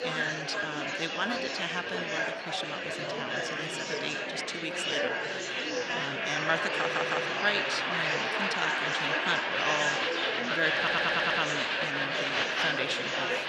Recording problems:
echo of what is said; strong; throughout; 100 ms later, 8 dB below the speech
thin; somewhat; fading below 600 Hz
murmuring crowd; very loud; throughout; 4 dB above the speech
audio stuttering; at 7 s and at 11 s

